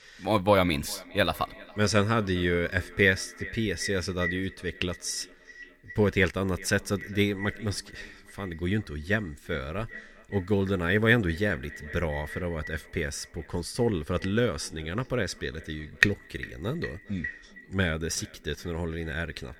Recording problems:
echo of what is said; noticeable; throughout; 400 ms later, 15 dB below the speech

